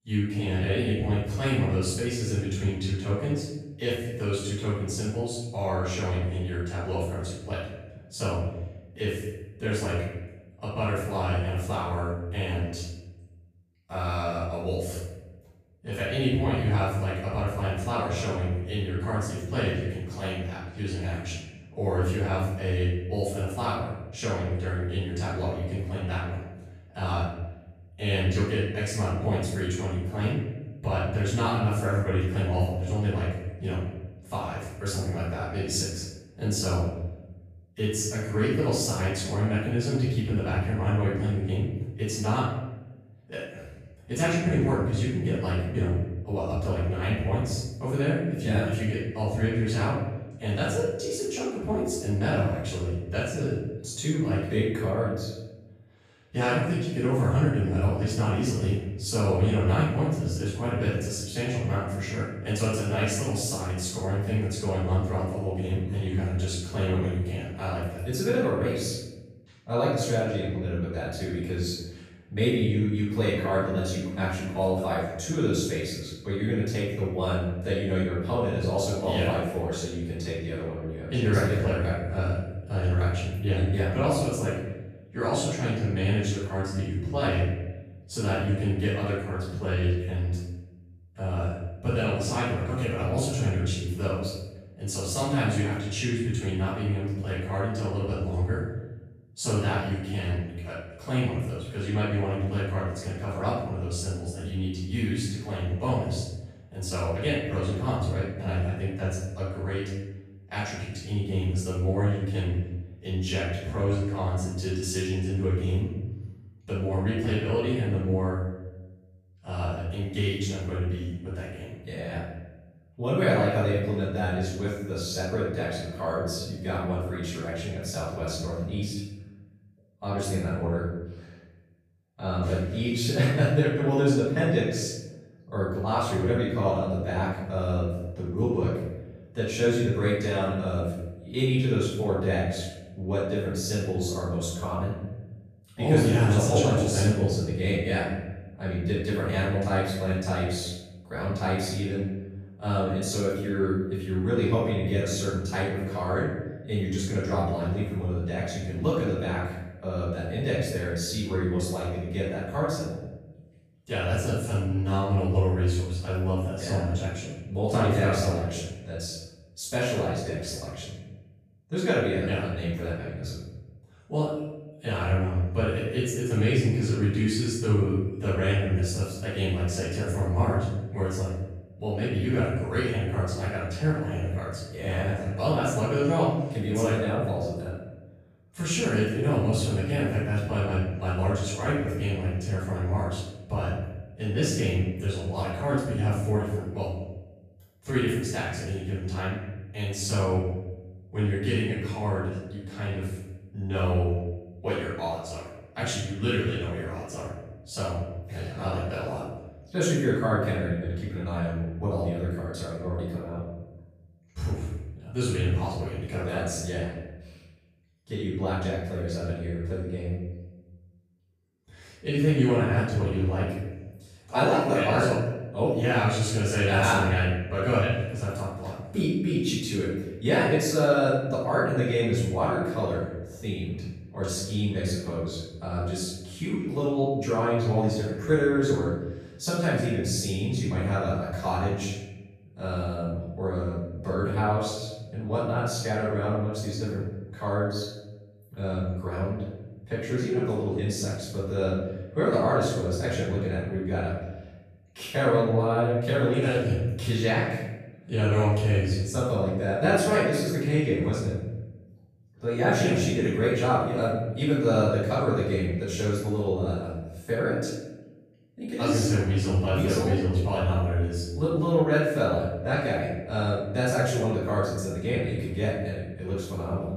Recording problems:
room echo; strong; dies away in 1.1 s
off-mic speech; far

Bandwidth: 14.5 kHz